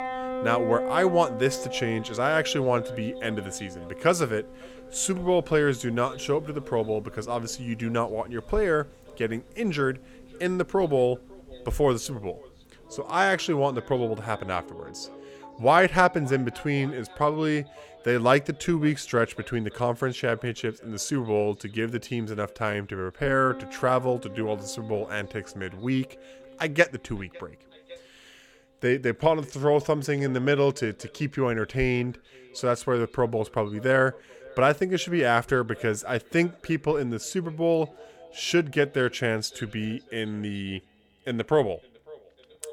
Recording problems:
echo of what is said; faint; throughout; 550 ms later, 25 dB below the speech
background music; noticeable; throughout; 15 dB below the speech

